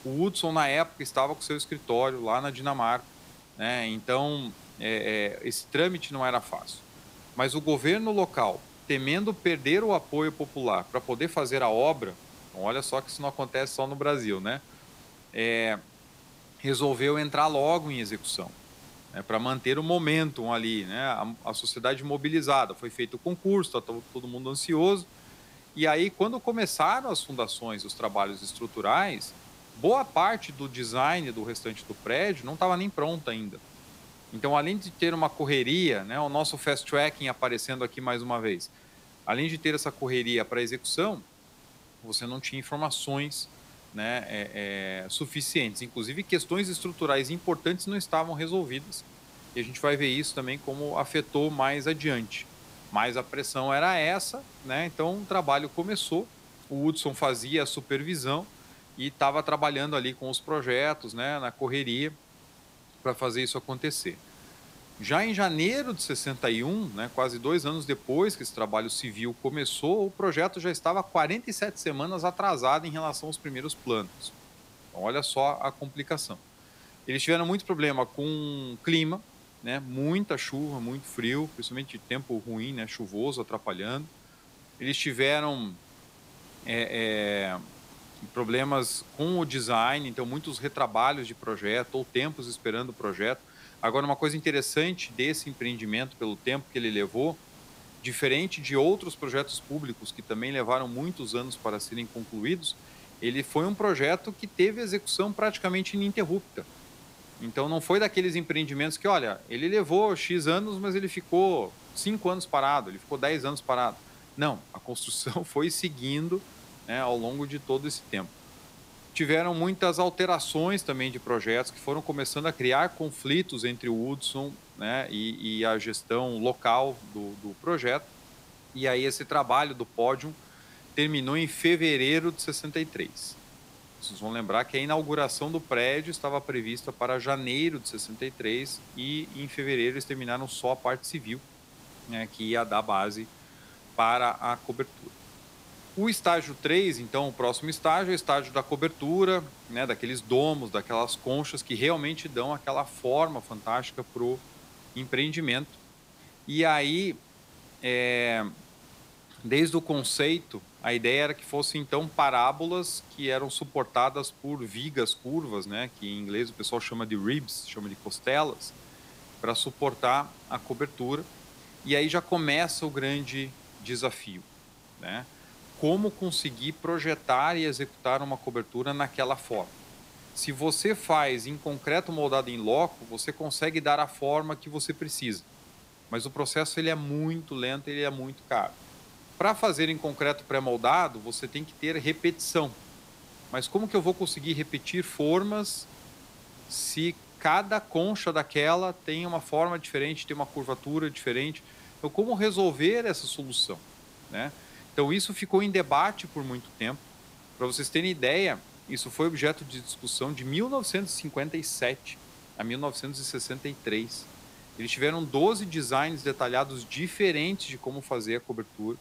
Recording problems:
hiss; faint; throughout; 20 dB below the speech

